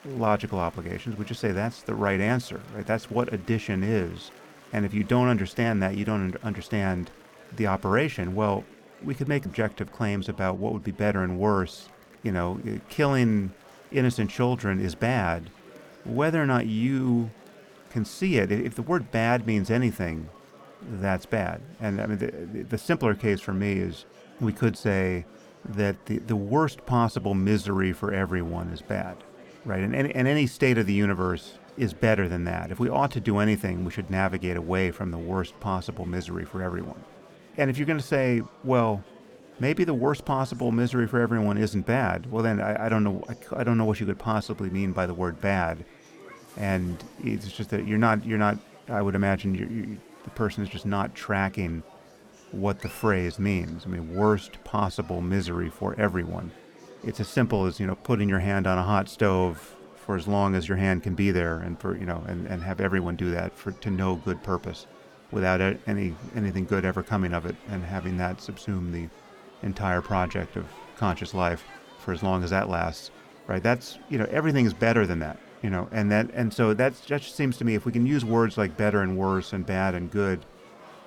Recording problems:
murmuring crowd; faint; throughout; 25 dB below the speech

